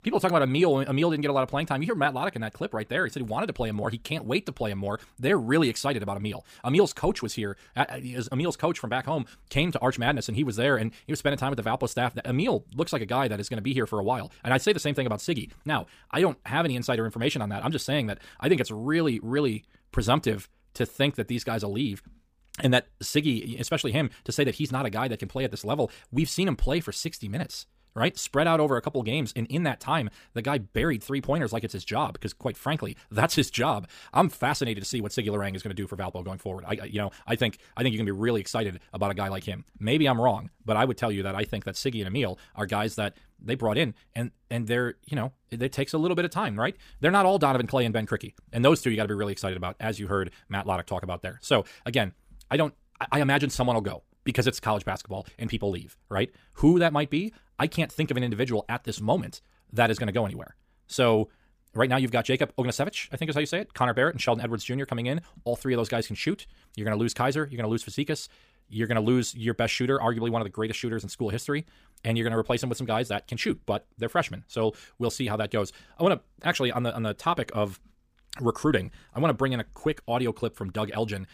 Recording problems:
wrong speed, natural pitch; too fast; 1.5 times normal speed

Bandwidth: 15 kHz